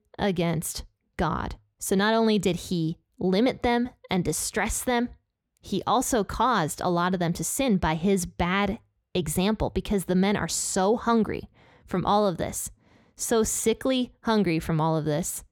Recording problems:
none

